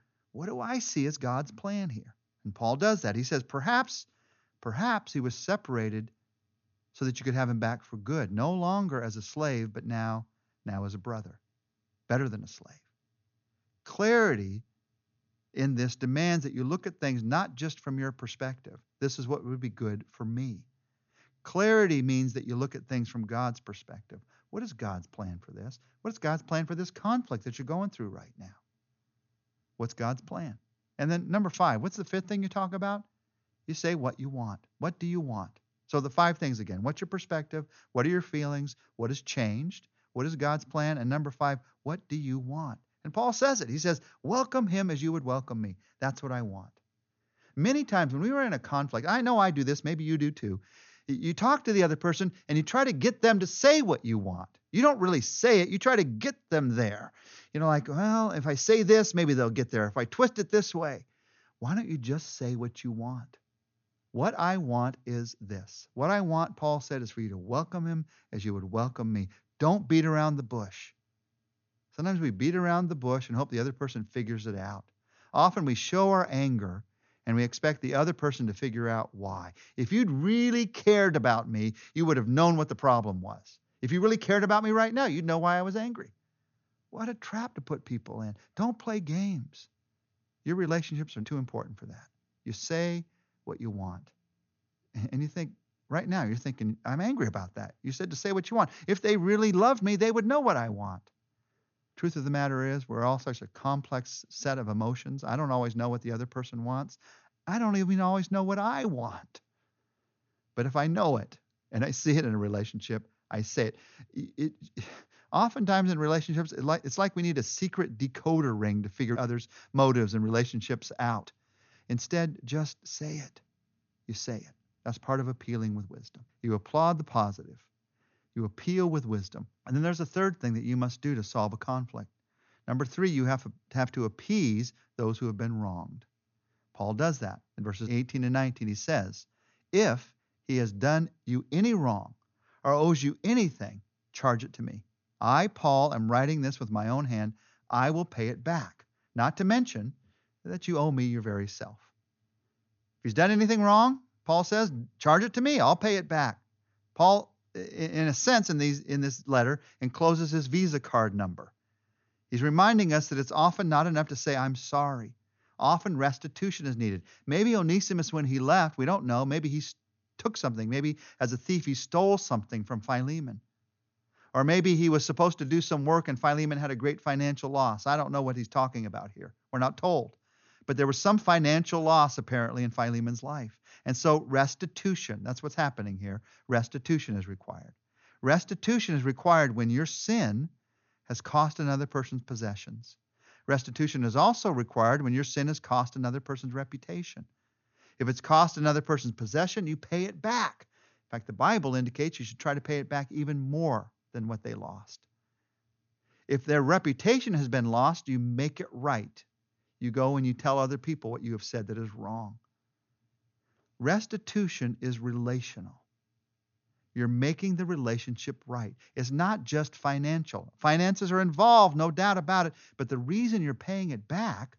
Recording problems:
high frequencies cut off; noticeable; nothing above 6.5 kHz

